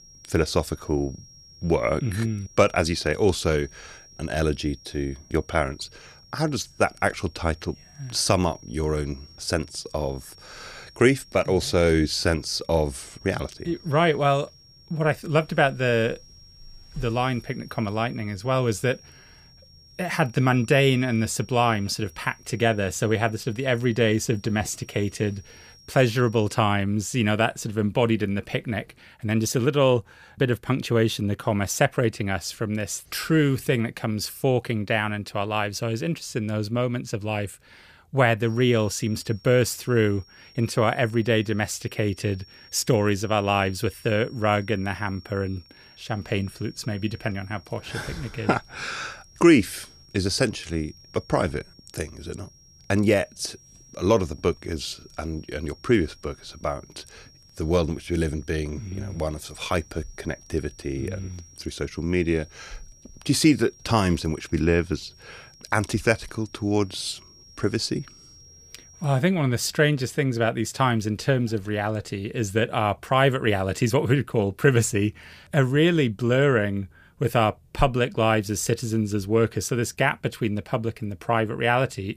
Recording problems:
high-pitched whine; faint; until 27 s and from 38 s to 1:09; 5.5 kHz, 25 dB below the speech

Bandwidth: 15 kHz